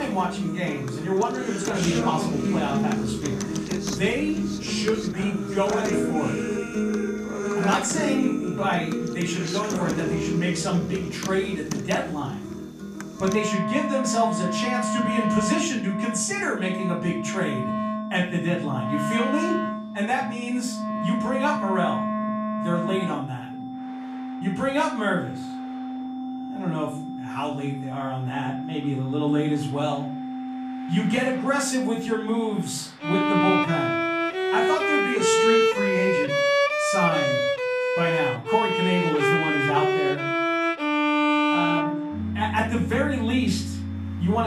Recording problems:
off-mic speech; far
room echo; slight; dies away in 0.4 s
background music; very loud; throughout; as loud as the speech
high-pitched whine; faint; throughout; 3.5 kHz, 30 dB below the speech
traffic noise; faint; throughout; 20 dB below the speech
abrupt cut into speech; at the start and the end

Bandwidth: 14.5 kHz